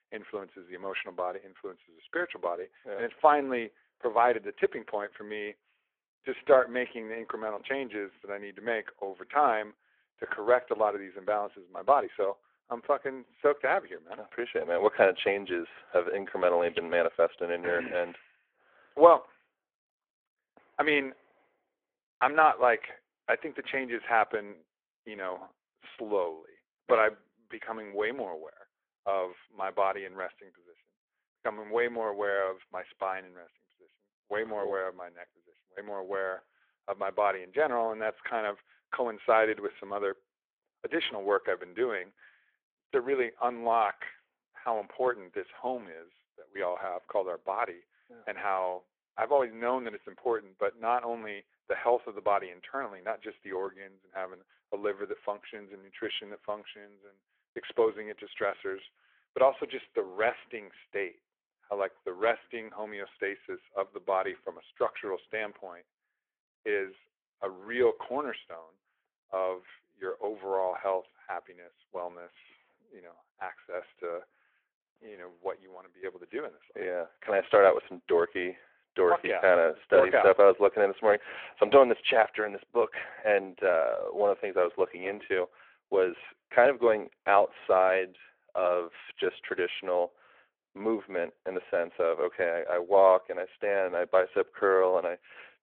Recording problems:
phone-call audio

